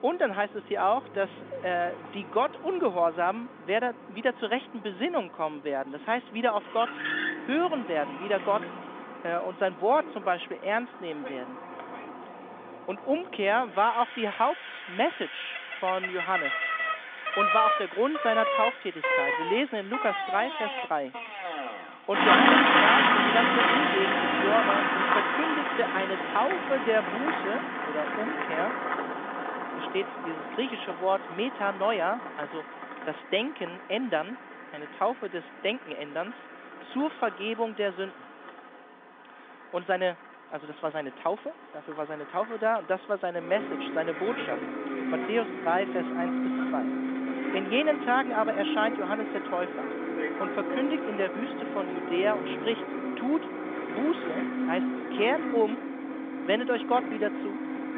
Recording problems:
phone-call audio; nothing above 3.5 kHz
traffic noise; very loud; throughout; 1 dB above the speech

